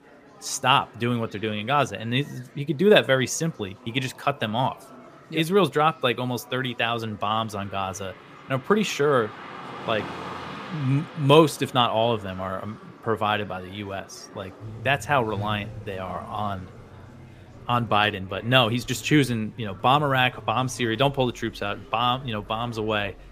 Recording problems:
traffic noise; noticeable; from 7 s on; 20 dB below the speech
murmuring crowd; faint; throughout; 25 dB below the speech

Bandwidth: 15 kHz